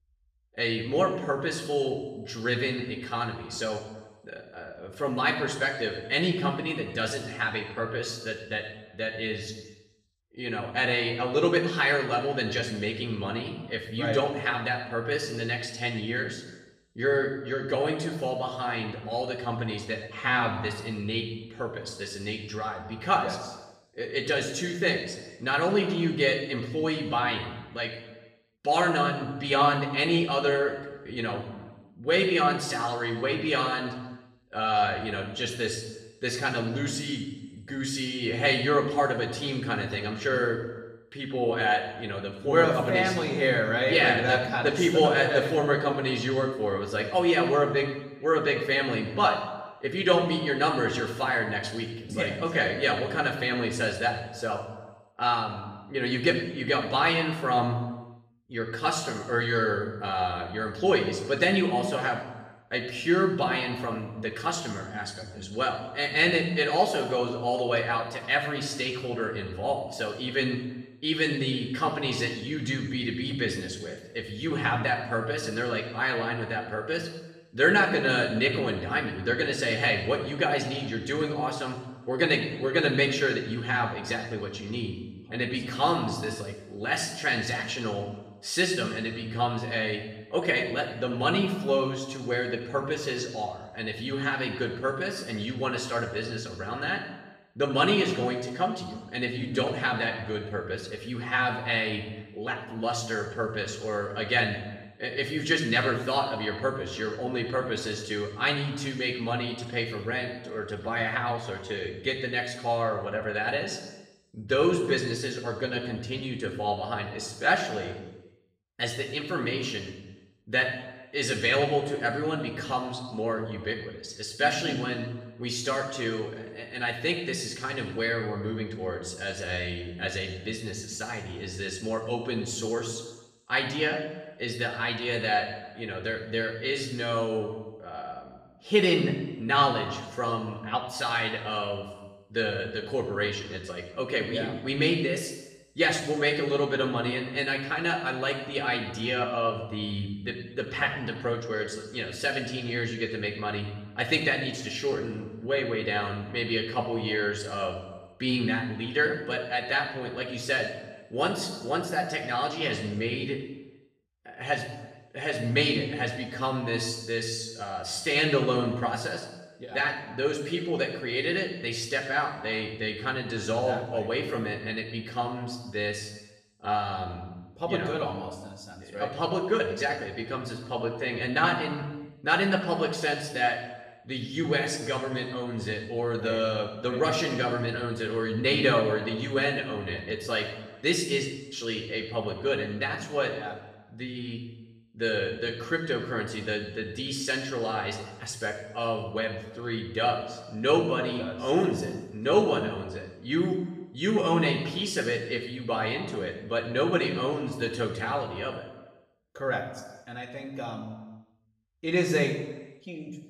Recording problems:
off-mic speech; far
room echo; noticeable; dies away in 0.9 s

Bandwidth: 15.5 kHz